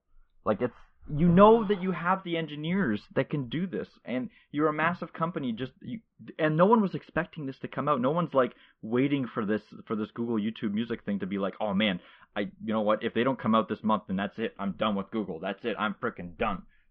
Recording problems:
muffled; very; fading above 3 kHz

